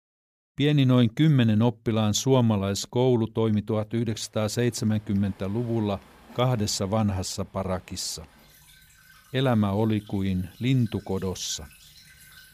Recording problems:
rain or running water; faint; from 4 s on; 25 dB below the speech

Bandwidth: 15 kHz